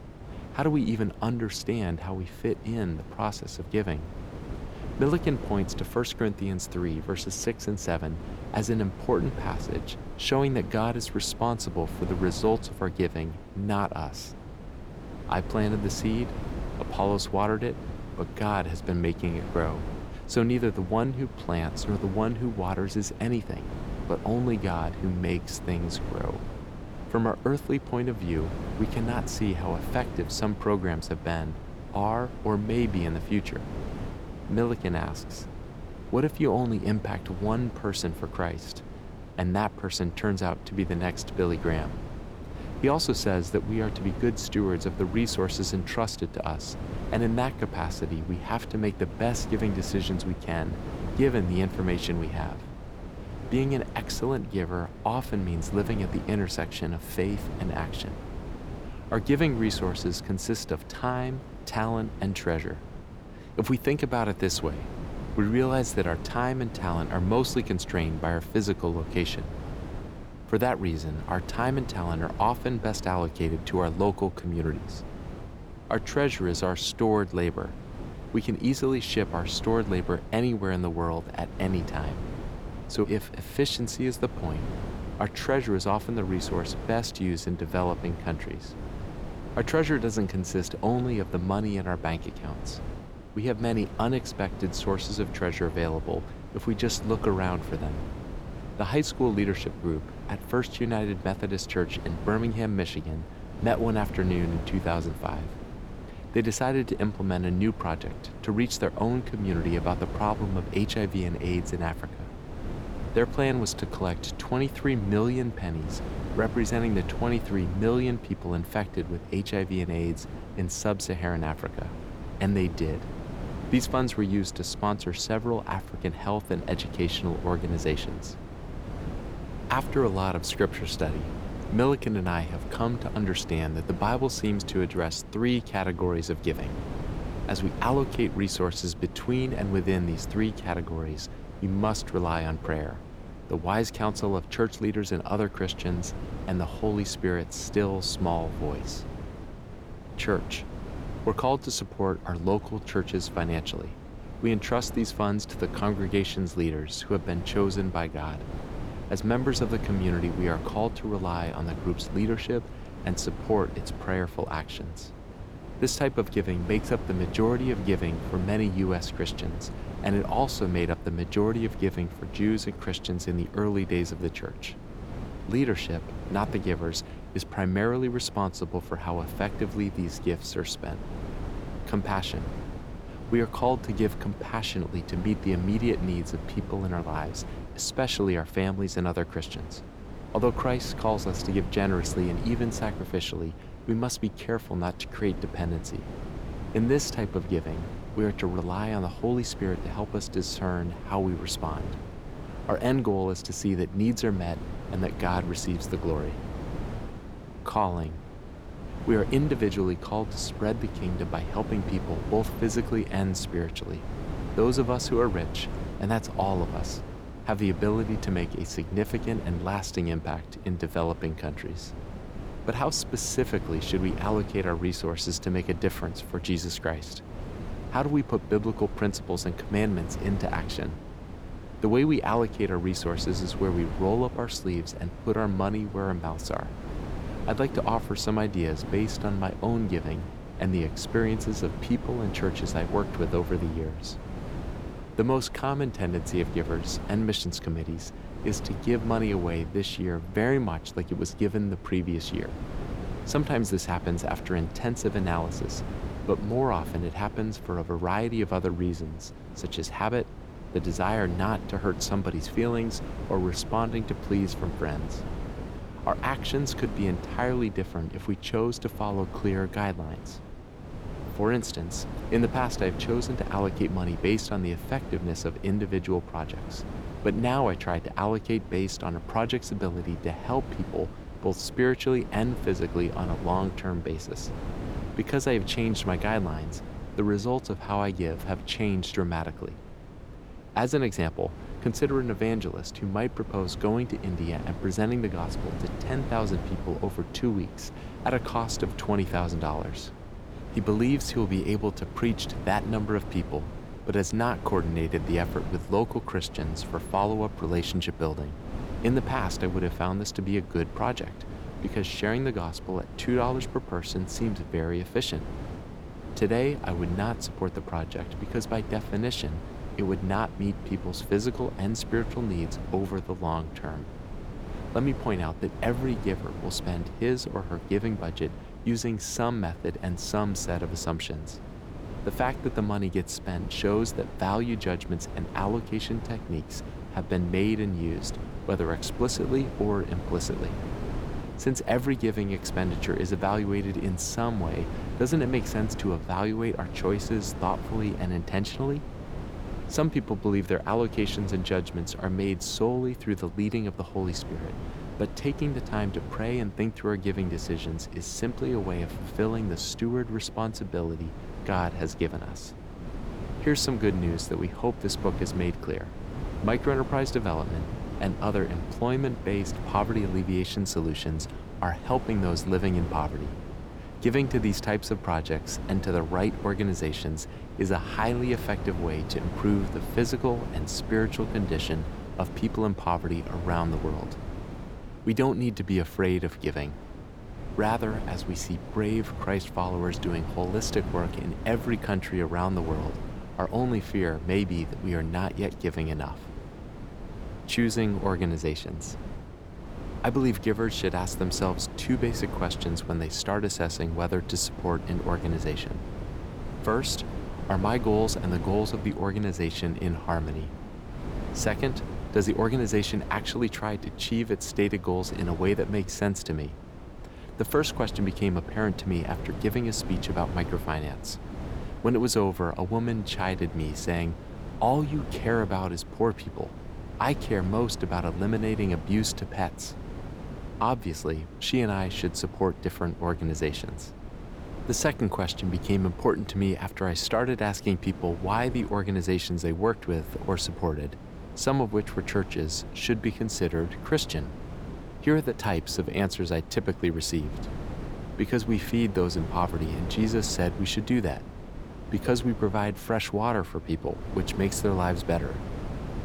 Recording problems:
wind noise on the microphone; occasional gusts; 10 dB below the speech

